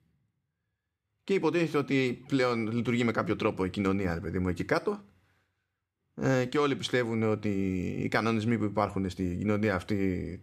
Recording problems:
none

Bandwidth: 14.5 kHz